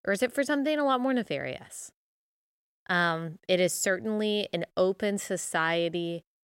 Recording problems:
none

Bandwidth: 16 kHz